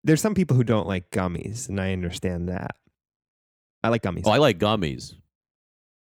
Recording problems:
uneven, jittery; strongly; from 0.5 to 4.5 s

